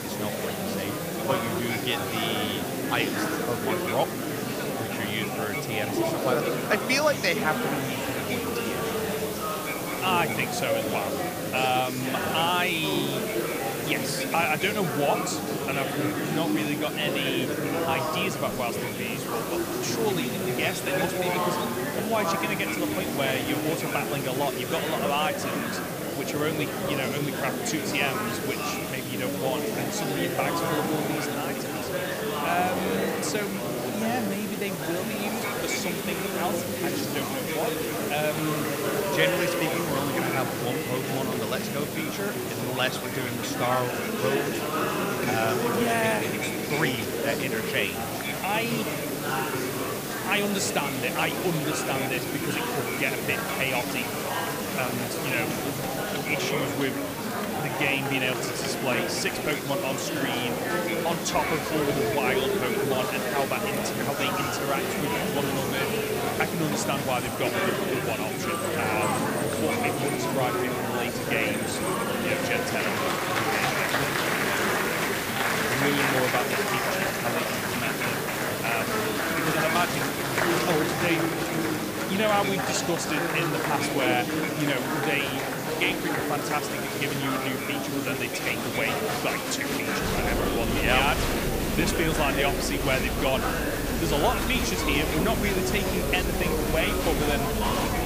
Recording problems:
murmuring crowd; very loud; throughout; 1 dB above the speech
hiss; loud; throughout; 7 dB below the speech

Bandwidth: 15 kHz